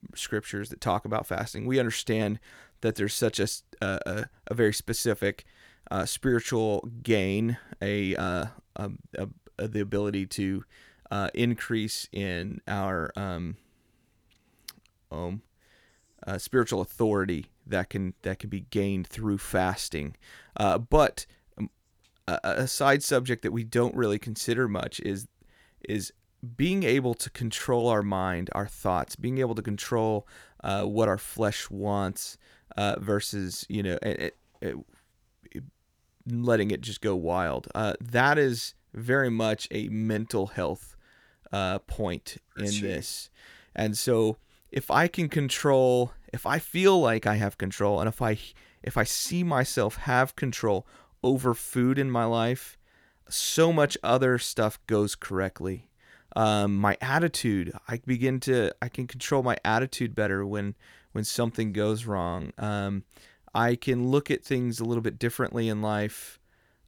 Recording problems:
none

